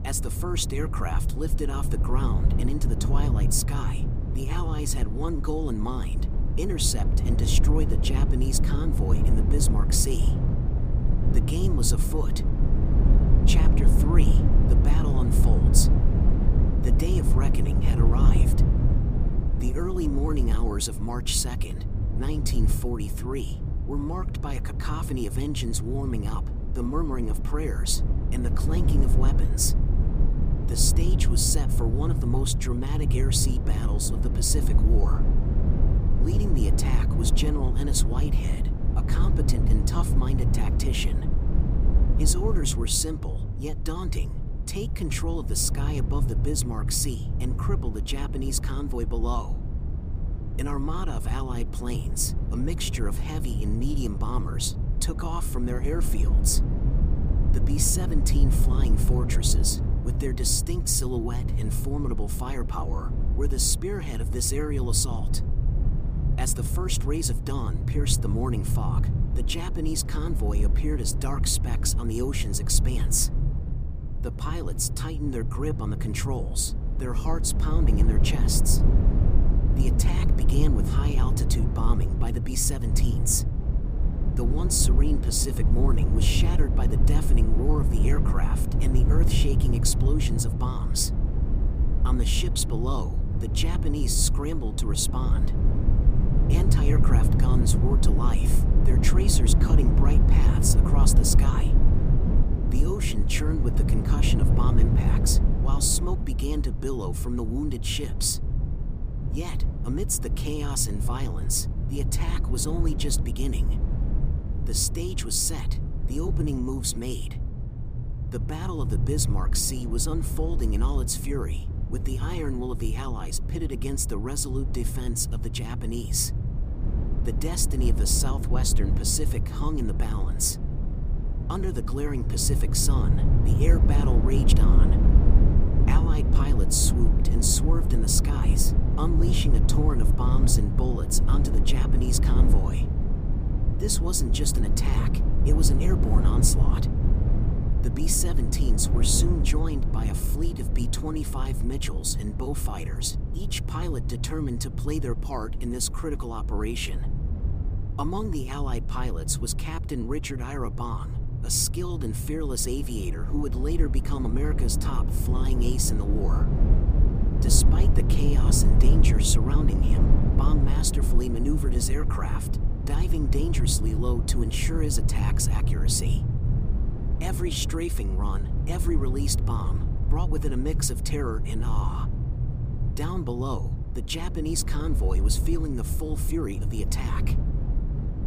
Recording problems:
low rumble; loud; throughout; 7 dB below the speech

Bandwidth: 15 kHz